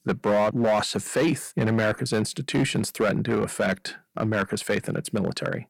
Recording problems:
distortion; slight; 7% of the sound clipped

